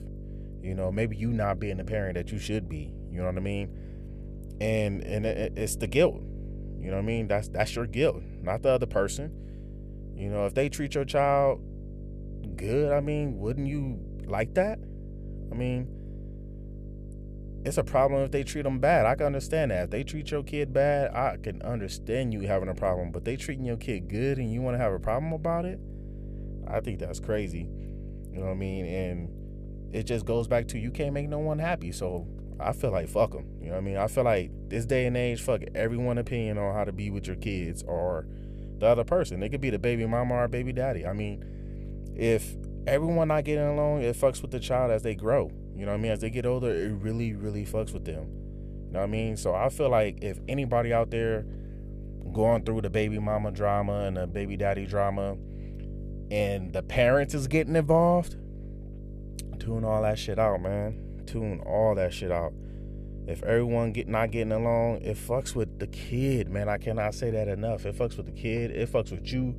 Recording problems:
electrical hum; faint; throughout; 50 Hz, 20 dB below the speech

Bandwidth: 14.5 kHz